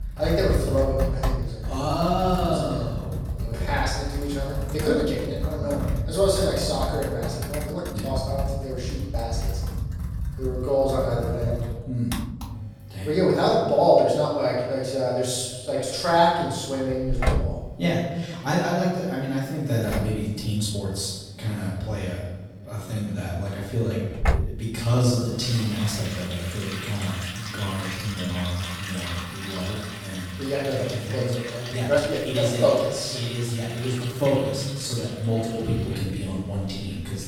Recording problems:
off-mic speech; far
room echo; noticeable; dies away in 1 s
household noises; loud; throughout; 6 dB below the speech
uneven, jittery; strongly; from 1.5 to 35 s

